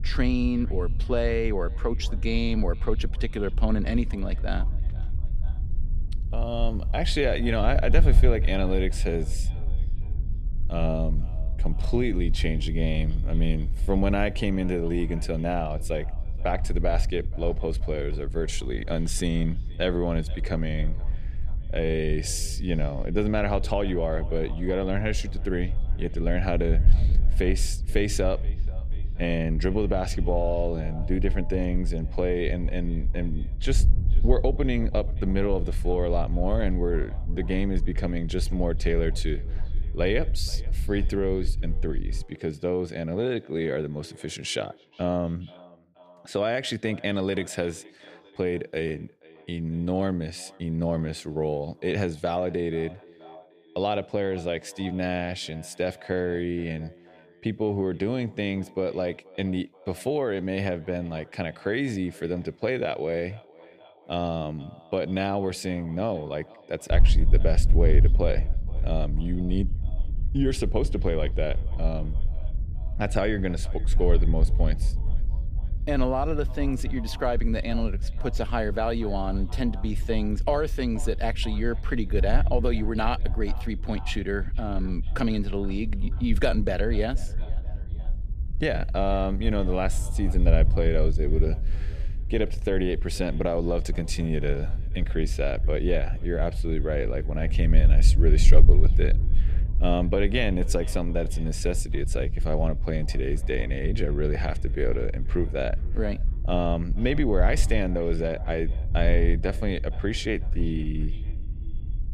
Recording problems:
echo of what is said; faint; throughout; 480 ms later, 20 dB below the speech
wind noise on the microphone; occasional gusts; until 42 s and from 1:07 on; 20 dB below the speech

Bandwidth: 15 kHz